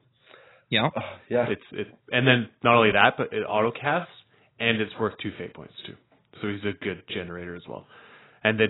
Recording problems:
garbled, watery; badly; nothing above 4 kHz
abrupt cut into speech; at the end

